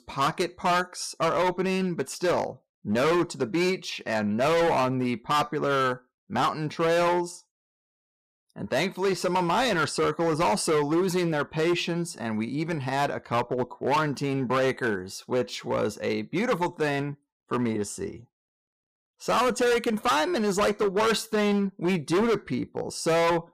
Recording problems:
distortion; heavy; 13% of the sound clipped

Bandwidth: 15 kHz